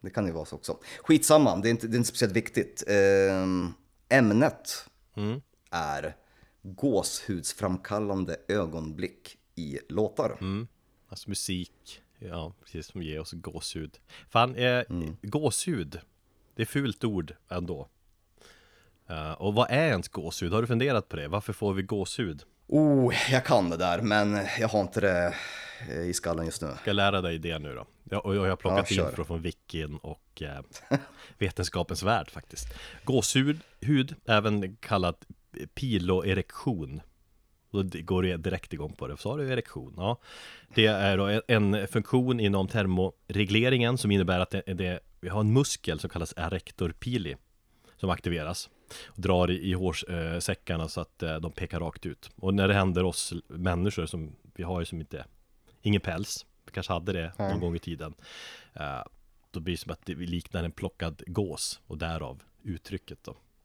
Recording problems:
none

